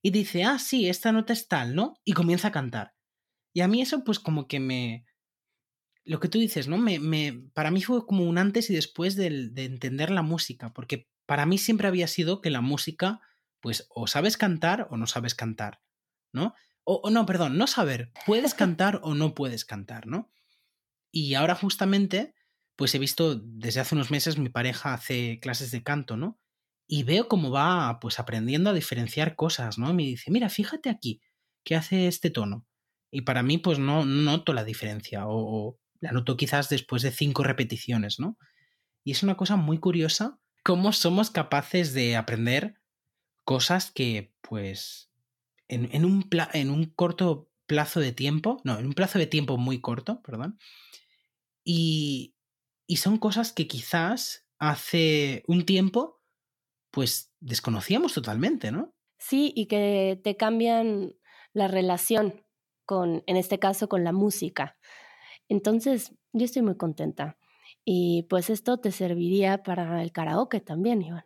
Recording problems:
none

